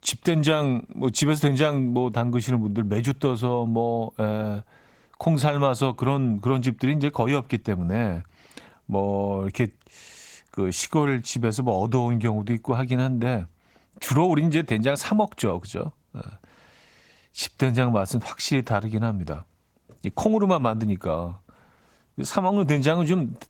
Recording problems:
garbled, watery; slightly; nothing above 17.5 kHz

